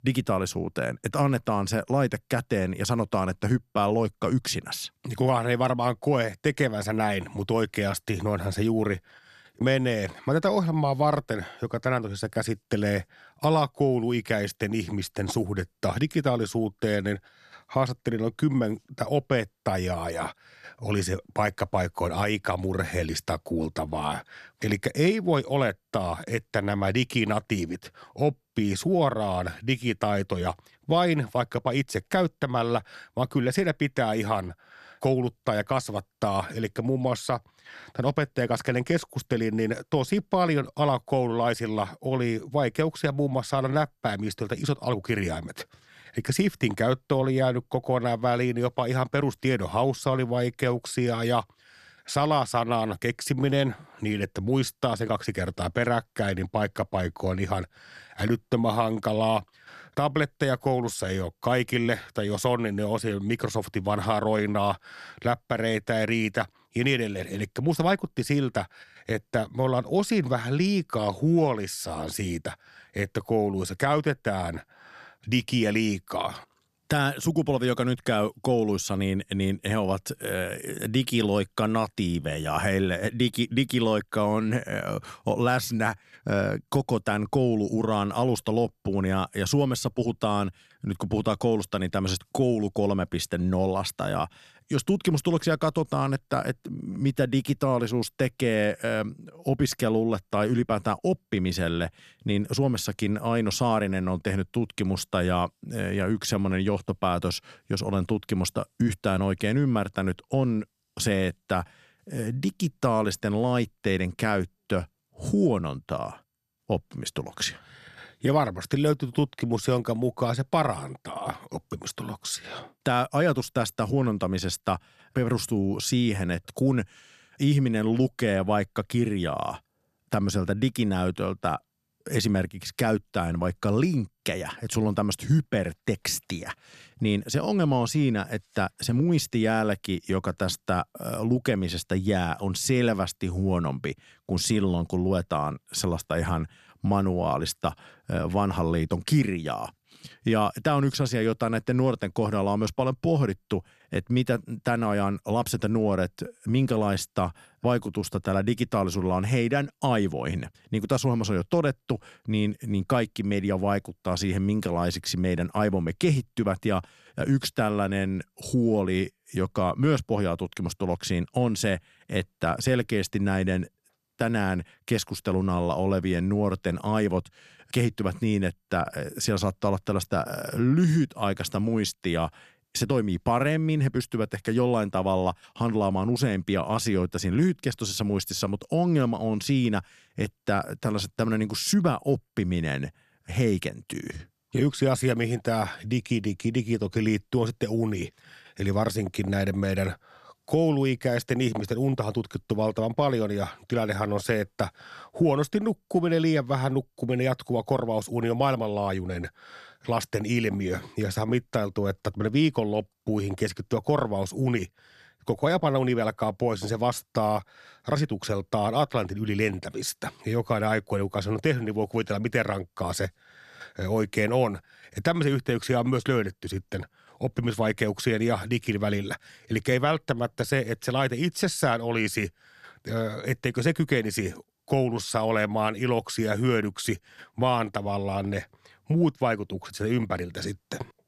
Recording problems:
none

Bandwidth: 13.5 kHz